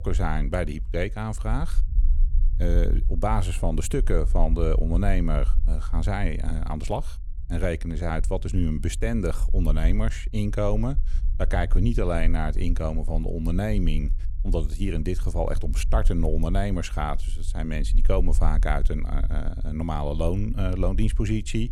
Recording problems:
low rumble; faint; throughout; 20 dB below the speech

